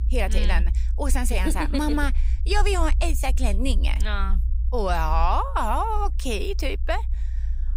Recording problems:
low rumble; faint; throughout; 20 dB below the speech

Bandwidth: 15.5 kHz